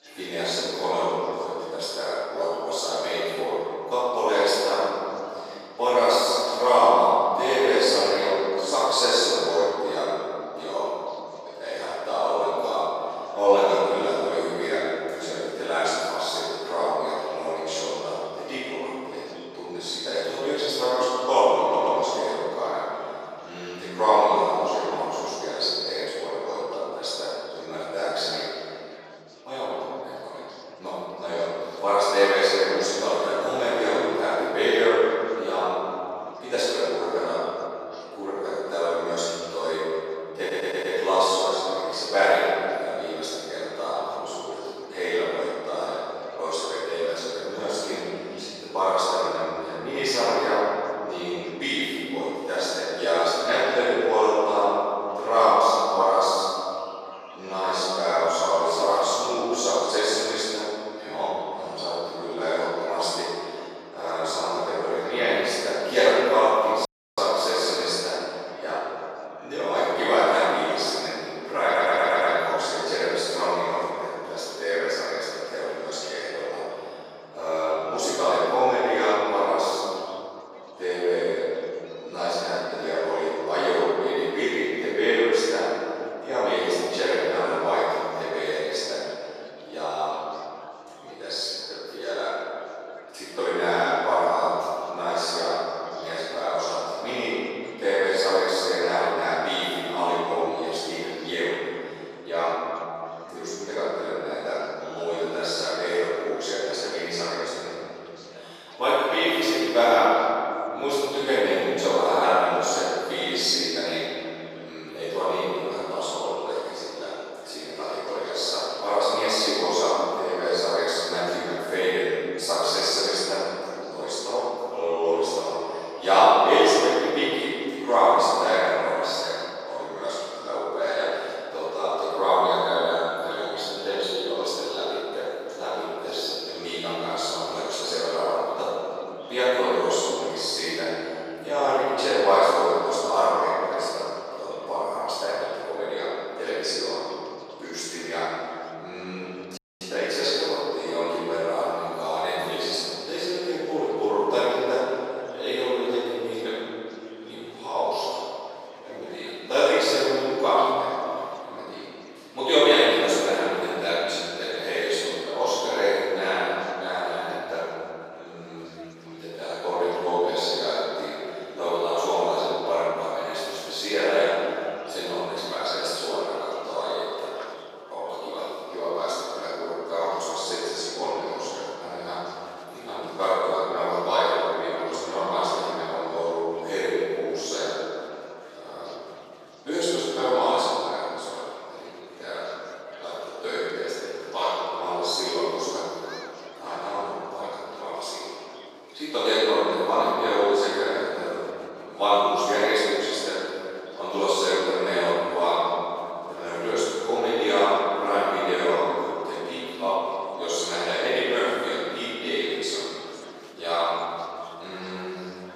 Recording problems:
room echo; strong; dies away in 2.7 s
off-mic speech; far
thin; very; fading below 400 Hz
murmuring crowd; faint; throughout; 25 dB below the speech
audio stuttering; at 22 s, at 40 s and at 1:12
audio cutting out; at 1:07 and at 2:30

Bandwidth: 14.5 kHz